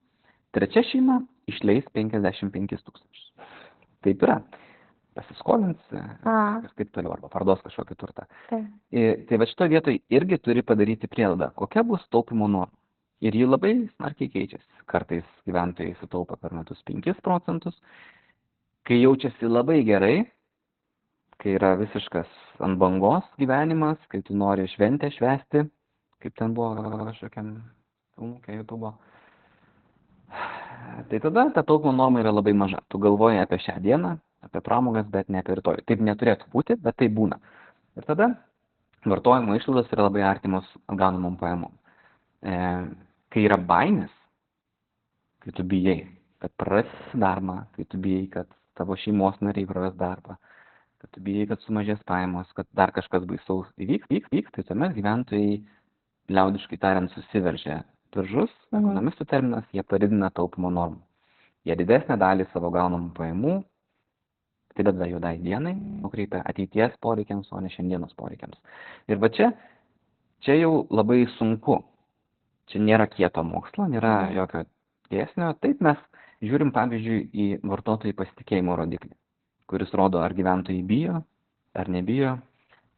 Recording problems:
garbled, watery; badly; nothing above 4 kHz
audio stuttering; at 27 s, at 47 s and at 54 s
audio freezing; at 1:06

